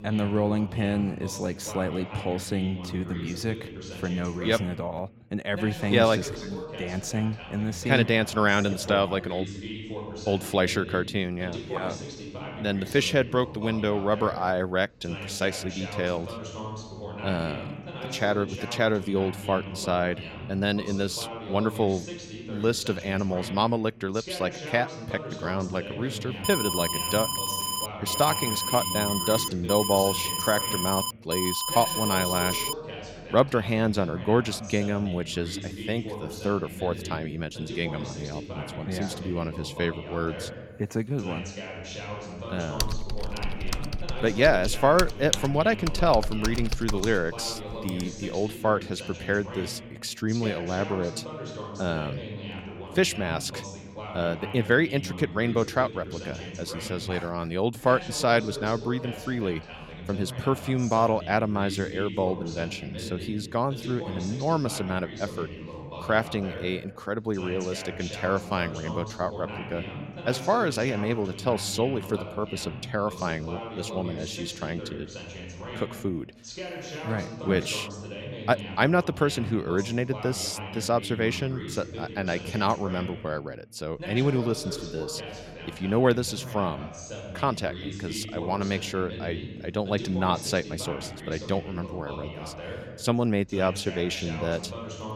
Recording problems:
voice in the background; noticeable; throughout; 10 dB below the speech
alarm; loud; from 26 to 33 s; peak 1 dB above the speech
keyboard typing; noticeable; from 43 to 48 s; peak 1 dB below the speech

